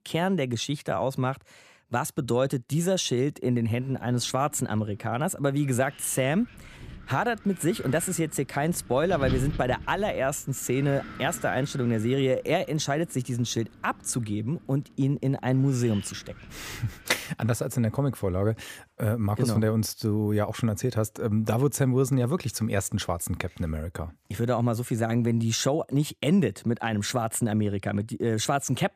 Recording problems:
wind noise on the microphone; occasional gusts; from 3.5 to 17 s; 15 dB below the speech

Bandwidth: 15 kHz